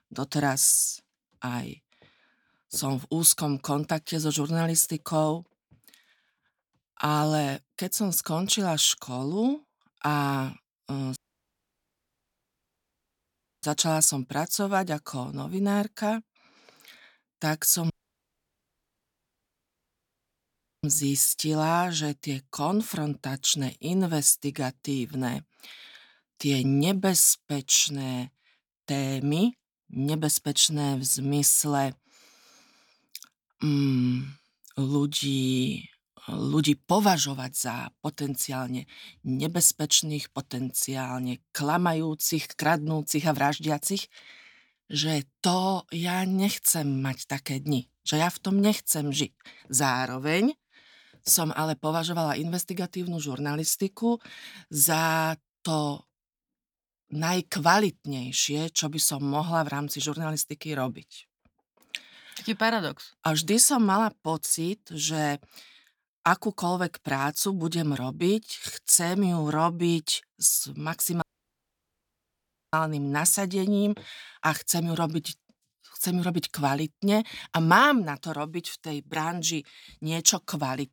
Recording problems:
audio cutting out; at 11 s for 2.5 s, at 18 s for 3 s and at 1:11 for 1.5 s

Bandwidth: 18.5 kHz